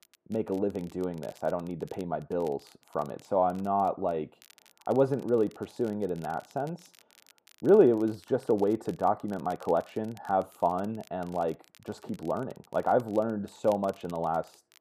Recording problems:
muffled; very; fading above 2.5 kHz
crackle, like an old record; faint; 30 dB below the speech

